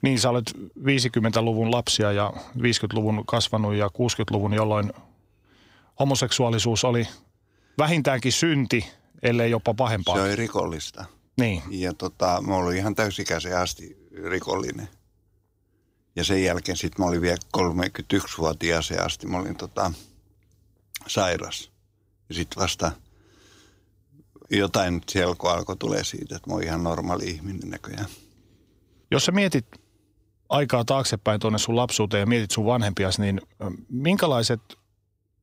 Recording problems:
none

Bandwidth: 15.5 kHz